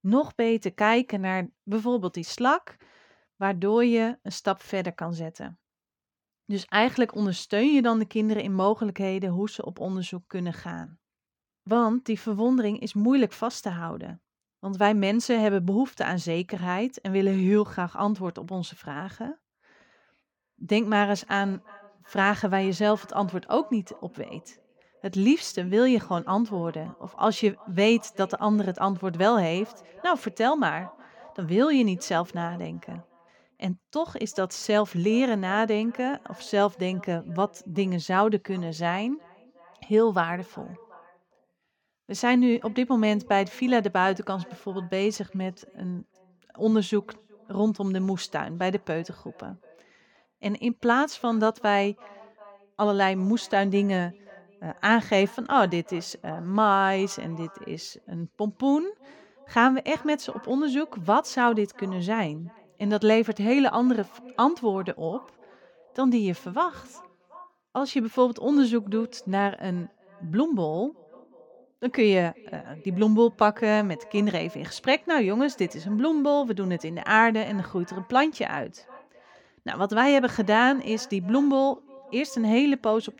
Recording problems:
echo of what is said; faint; from 20 s on; 370 ms later, 25 dB below the speech

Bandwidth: 17.5 kHz